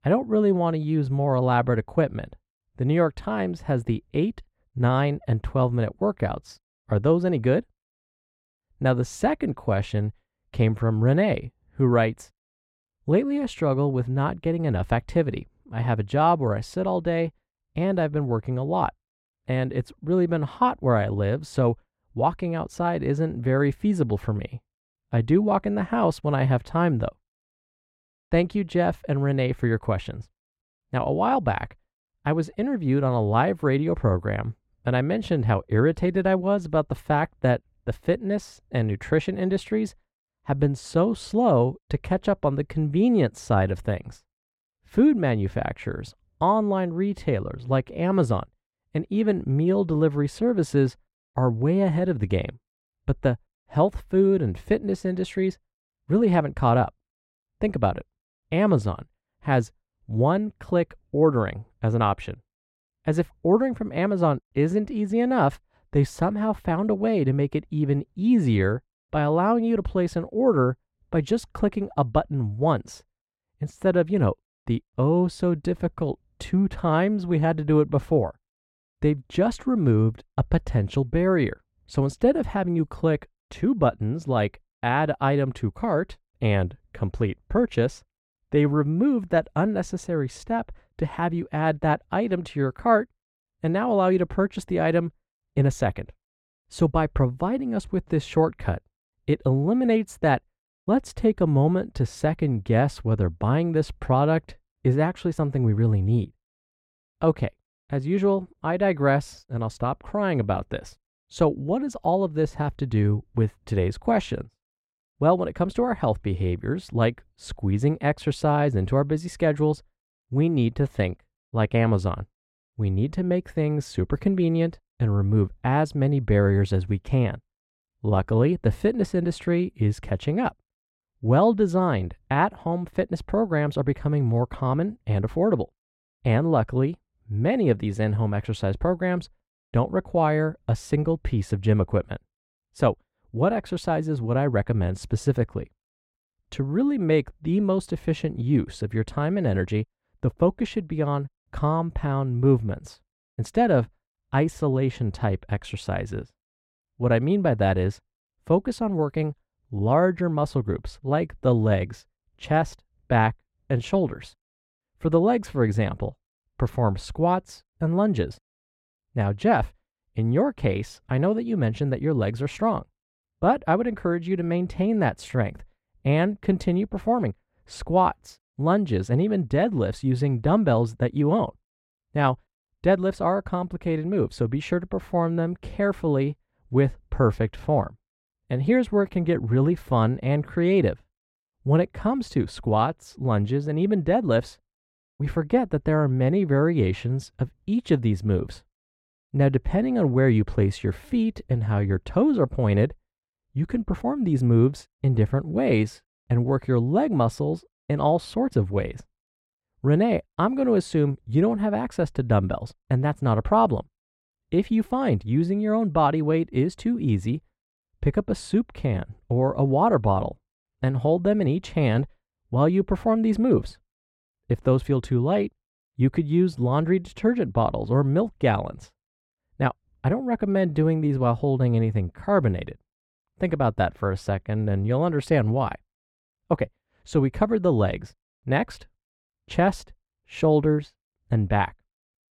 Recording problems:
muffled; slightly; fading above 2 kHz

